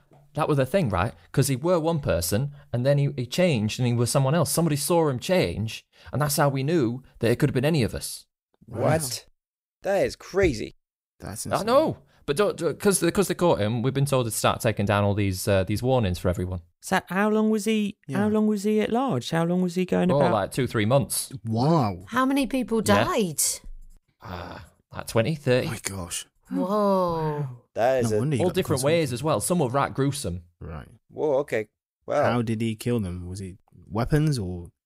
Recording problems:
none

